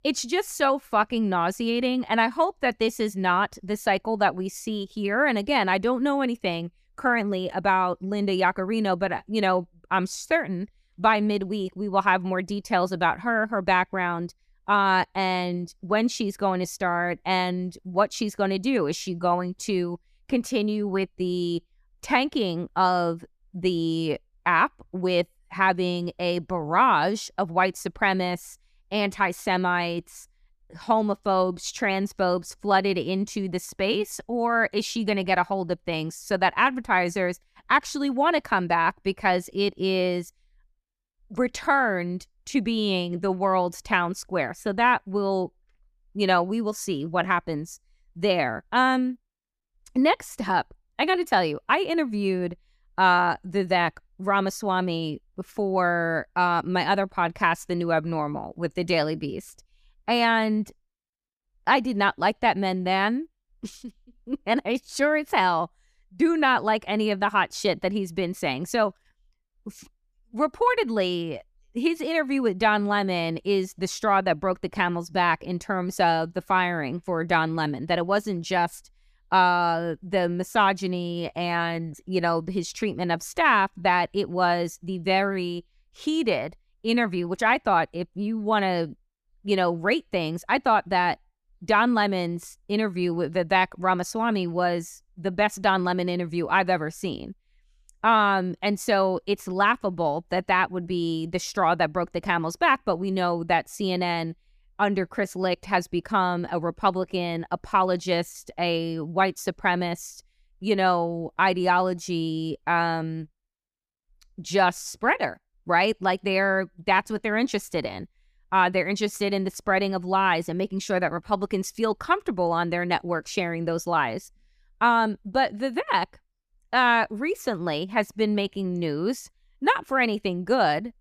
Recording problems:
none

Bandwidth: 14.5 kHz